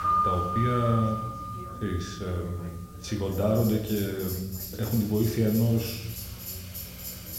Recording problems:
room echo; slight; dies away in 0.7 s
off-mic speech; somewhat distant
background music; loud; throughout; 6 dB below the speech
chatter from many people; faint; throughout; 20 dB below the speech
hiss; faint; throughout; 20 dB below the speech
low rumble; faint; throughout; 25 dB below the speech

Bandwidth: 16 kHz